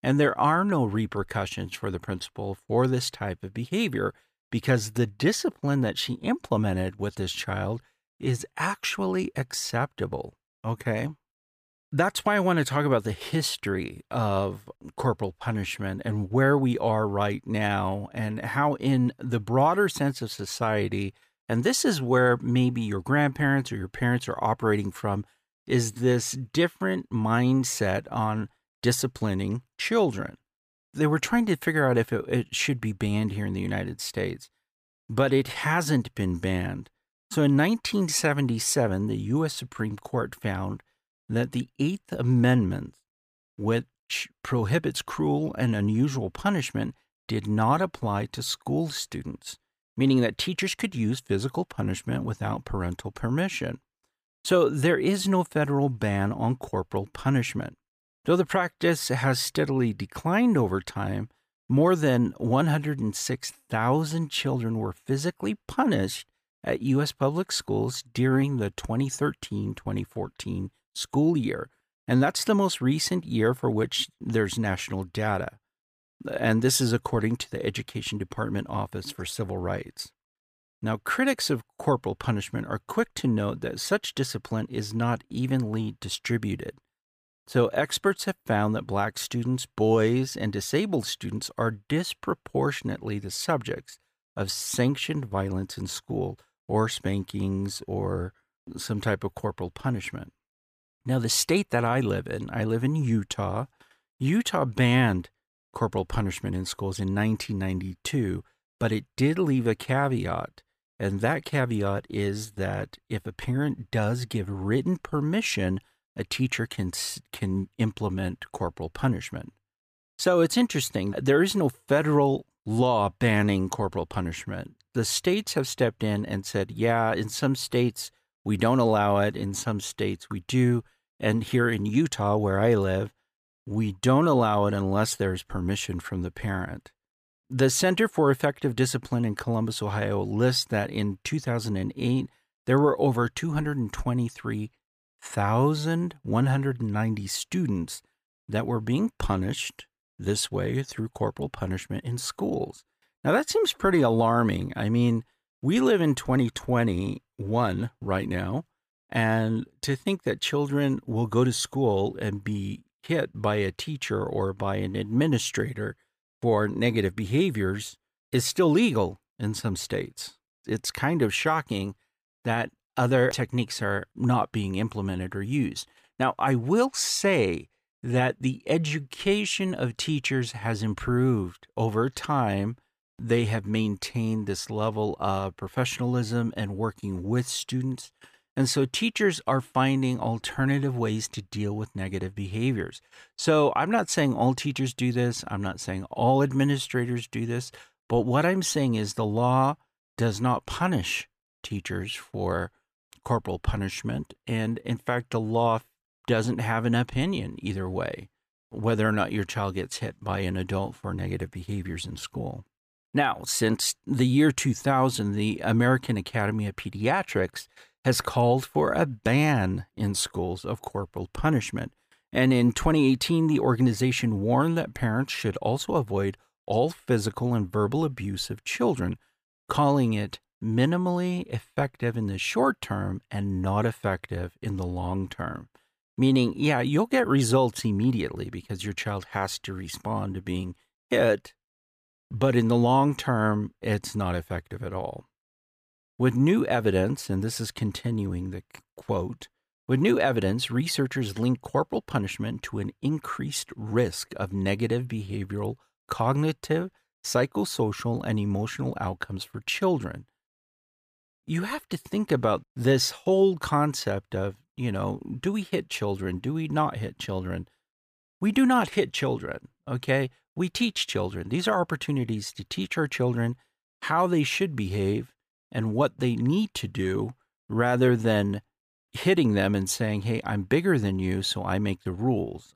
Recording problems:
none

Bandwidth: 15 kHz